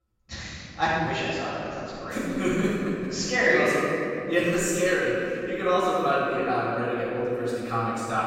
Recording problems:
room echo; strong; dies away in 2.9 s
off-mic speech; far

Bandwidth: 16 kHz